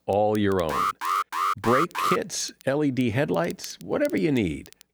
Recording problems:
crackle, like an old record; faint; 25 dB below the speech
alarm; loud; from 0.5 to 2 s; peak 1 dB above the speech

